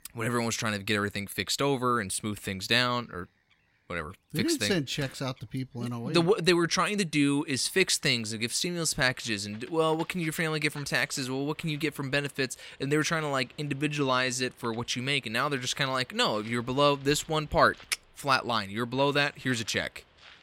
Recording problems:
animal sounds; faint; throughout; 25 dB below the speech

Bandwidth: 16 kHz